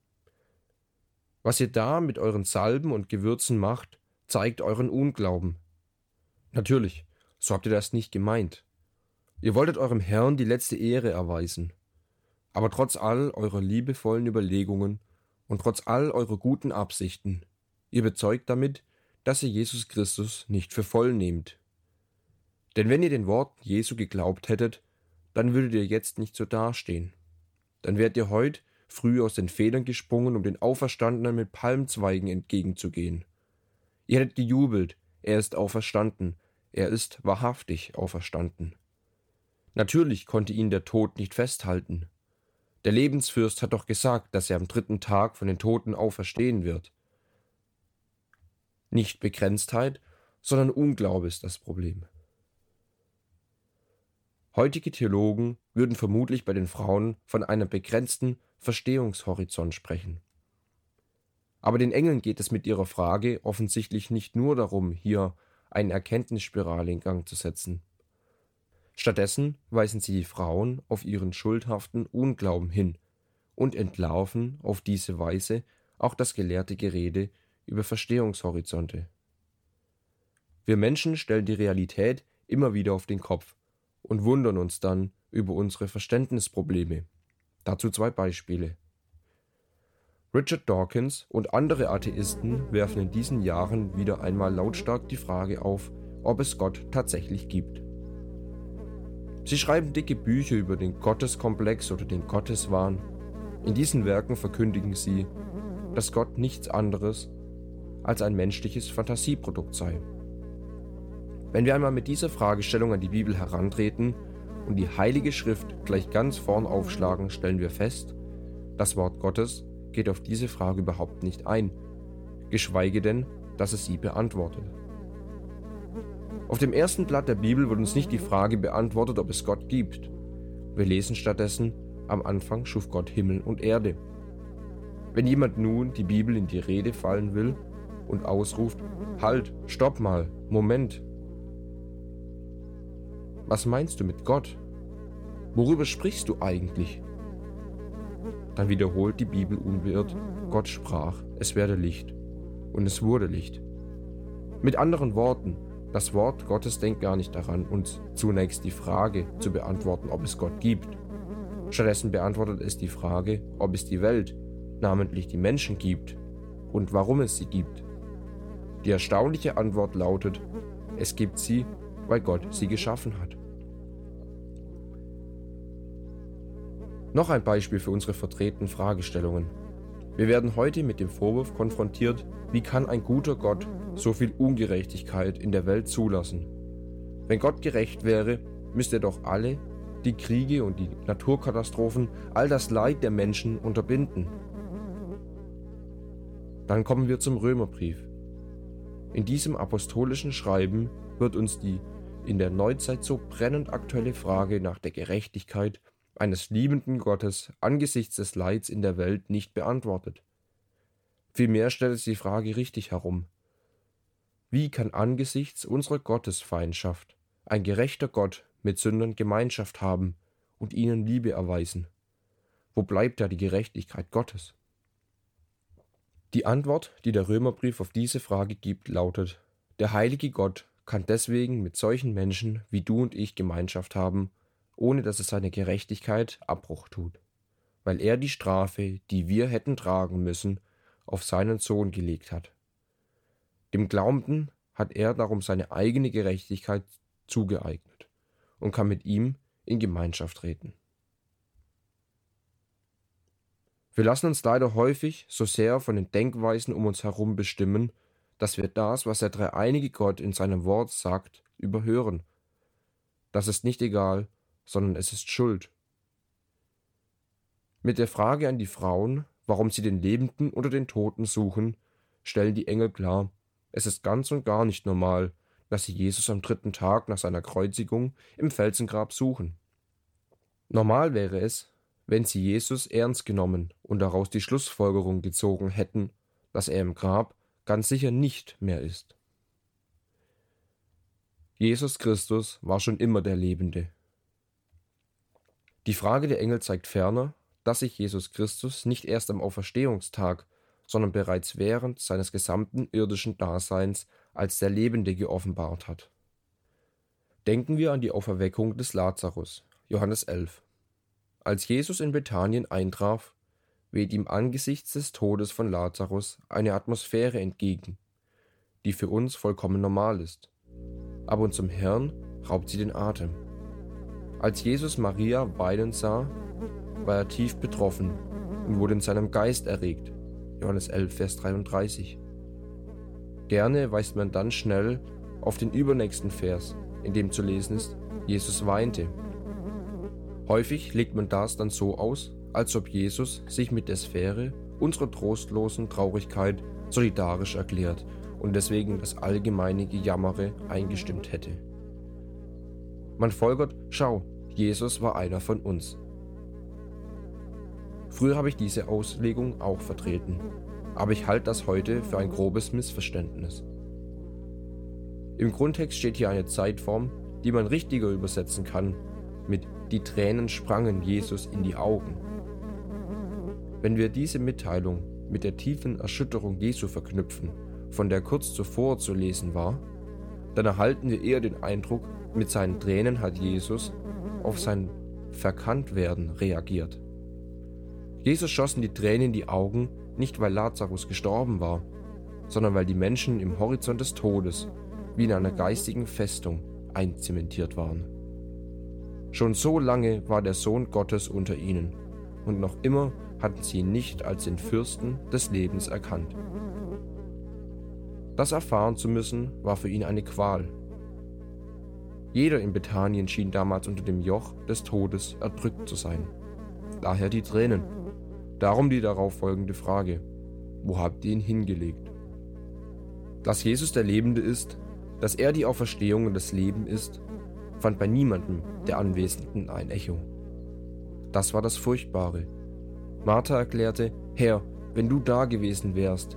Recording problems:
electrical hum; noticeable; from 1:32 to 3:25 and from 5:21 on; 60 Hz, 15 dB below the speech

